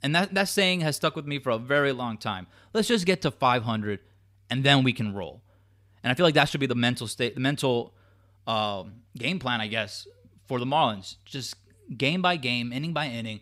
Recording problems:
none

